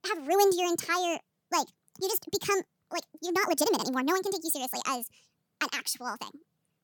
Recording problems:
wrong speed and pitch; too fast and too high; 1.6 times normal speed

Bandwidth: 18.5 kHz